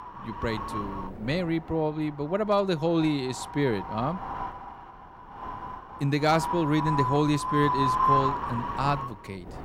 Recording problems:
wind noise on the microphone; heavy; 1 dB above the speech

